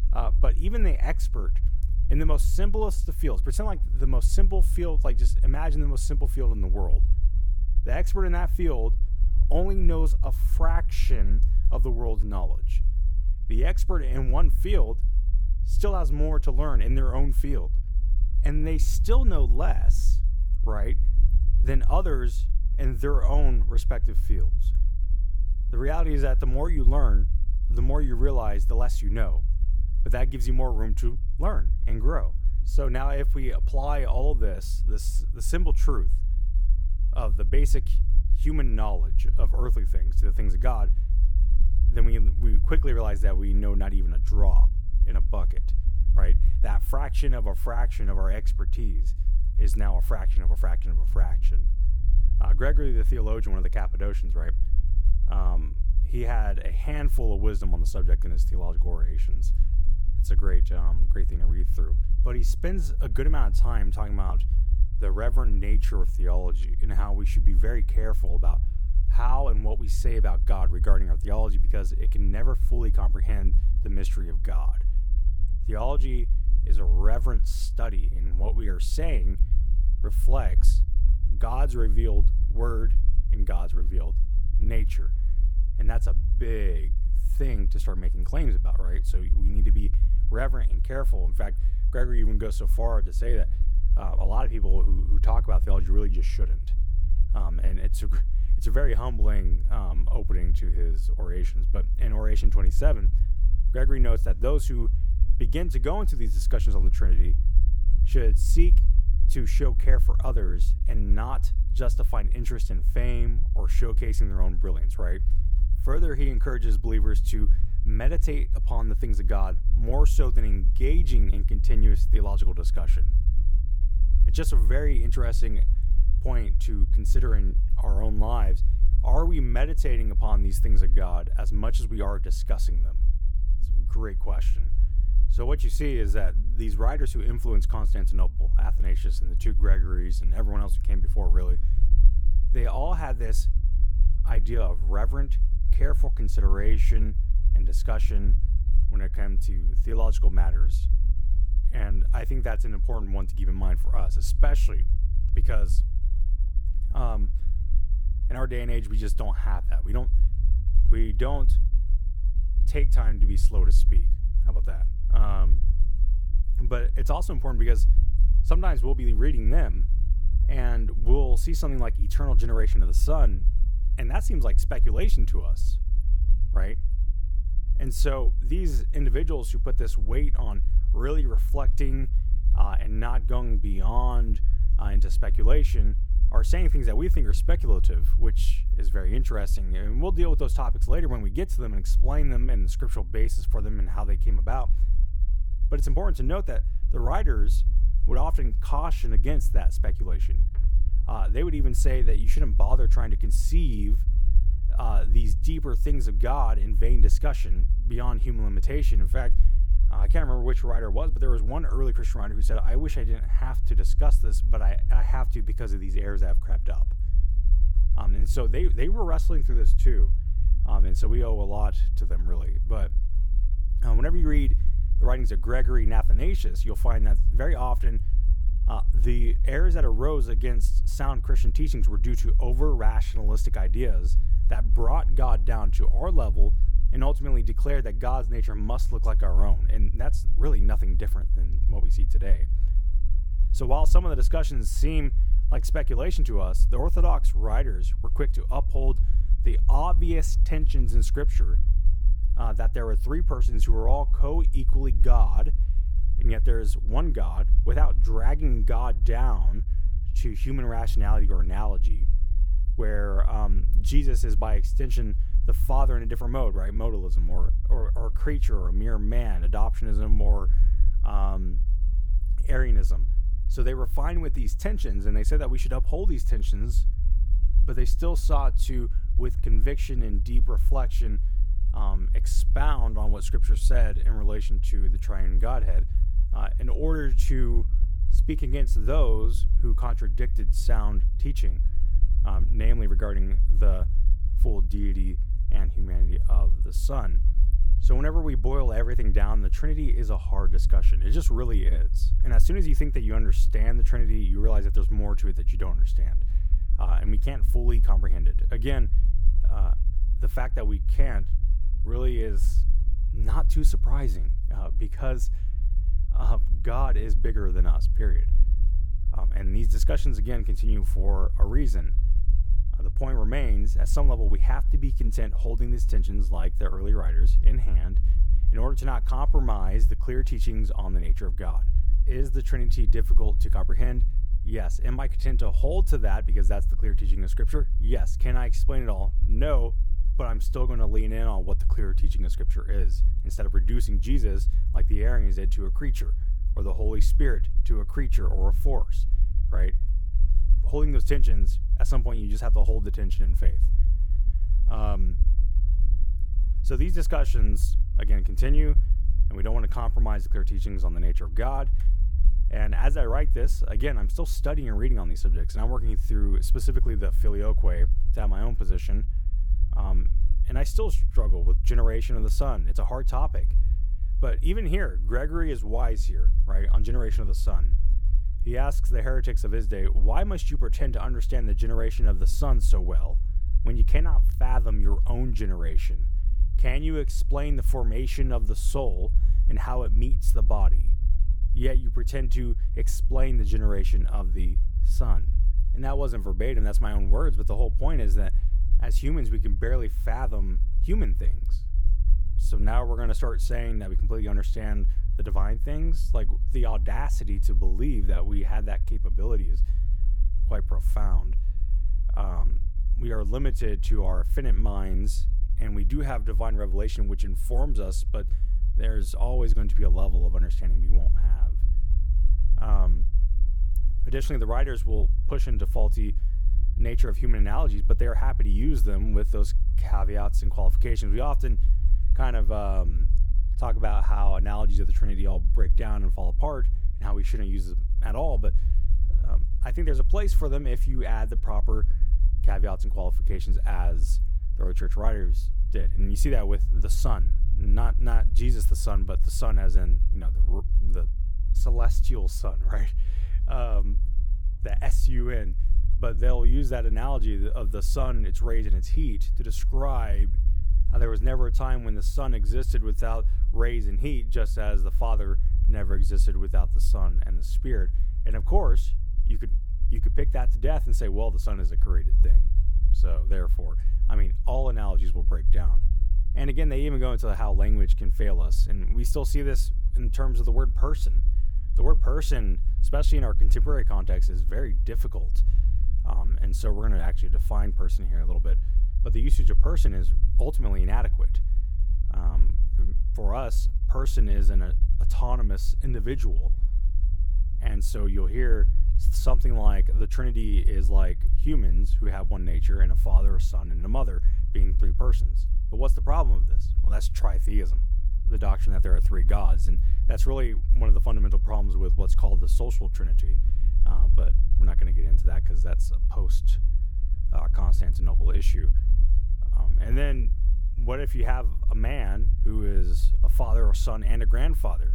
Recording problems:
low rumble; noticeable; throughout; 15 dB below the speech

